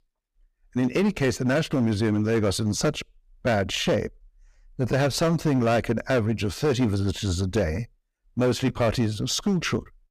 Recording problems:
distortion; slight; 8% of the sound clipped

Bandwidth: 15 kHz